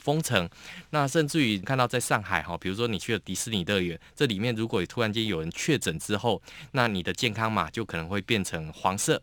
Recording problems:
none

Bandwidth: 18.5 kHz